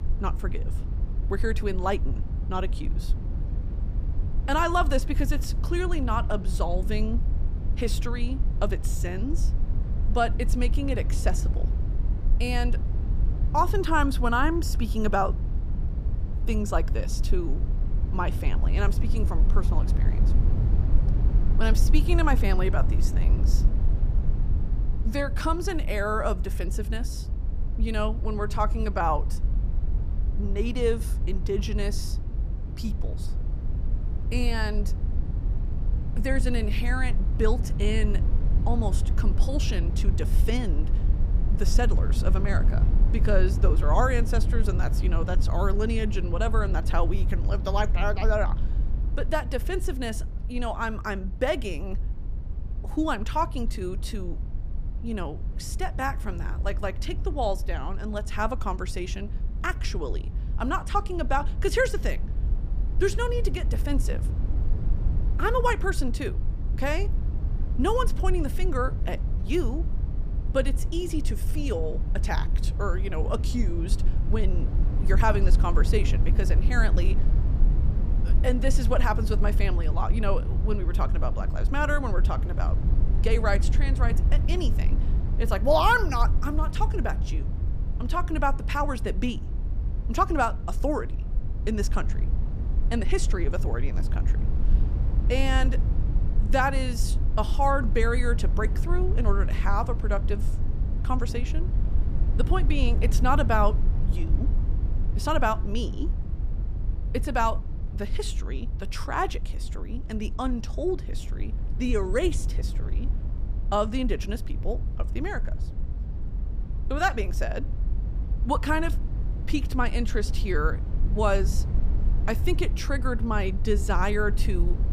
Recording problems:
low rumble; noticeable; throughout; 15 dB below the speech

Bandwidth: 15 kHz